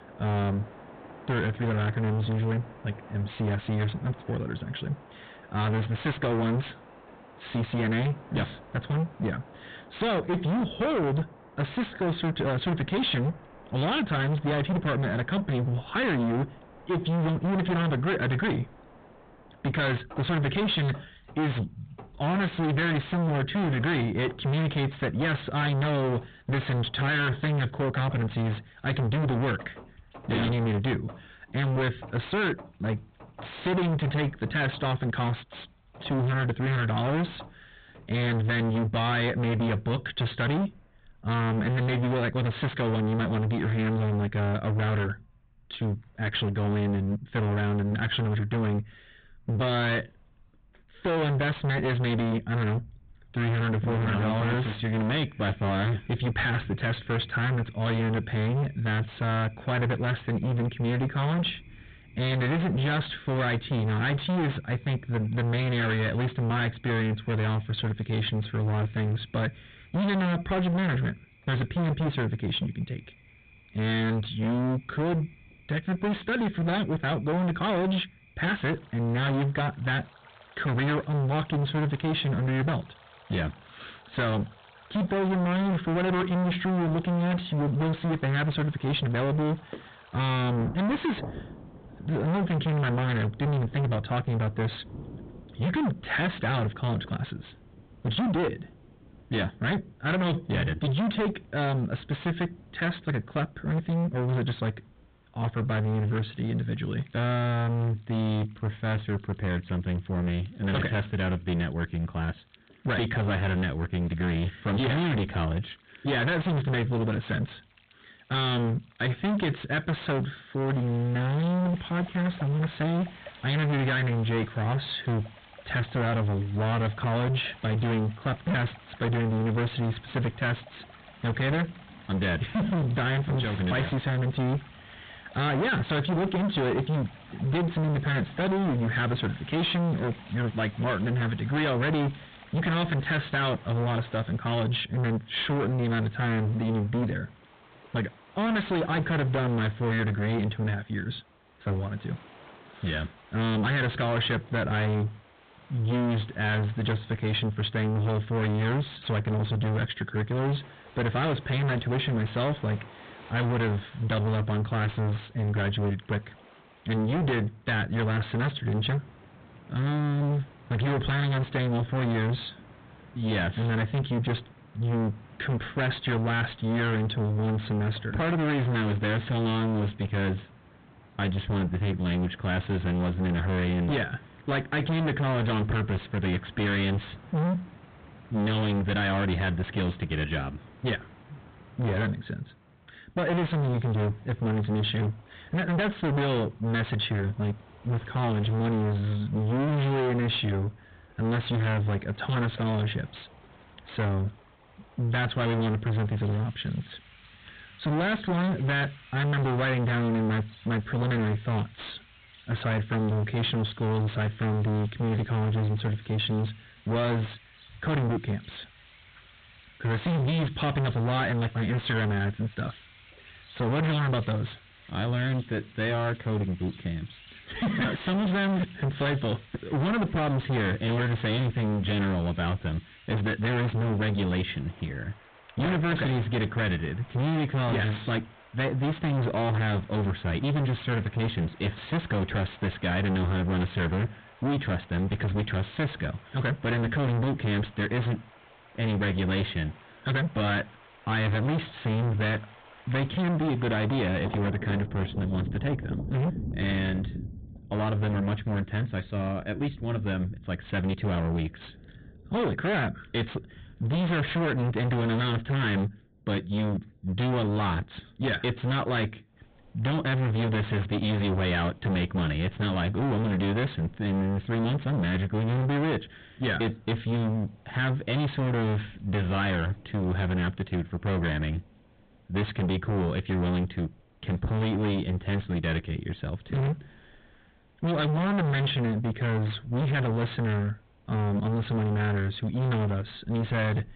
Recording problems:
distortion; heavy; 34% of the sound clipped
high frequencies cut off; severe; nothing above 4 kHz
rain or running water; faint; throughout; 20 dB below the speech

